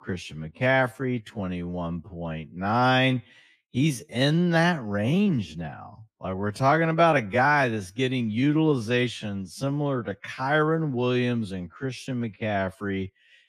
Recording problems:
wrong speed, natural pitch; too slow; 0.6 times normal speed

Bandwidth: 15 kHz